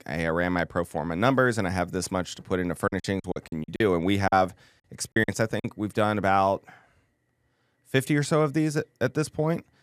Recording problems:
choppy; very; from 3 to 5.5 s; 18% of the speech affected

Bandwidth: 14.5 kHz